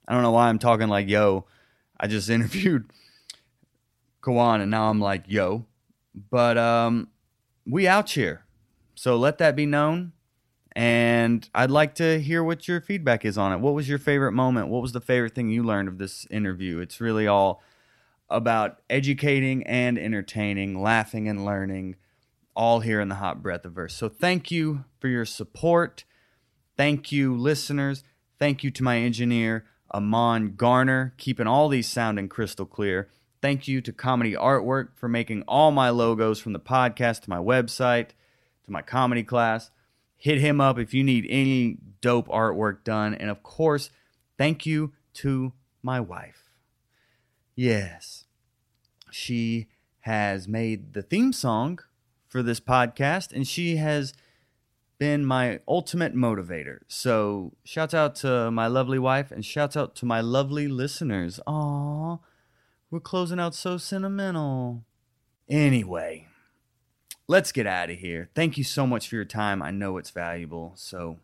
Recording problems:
none

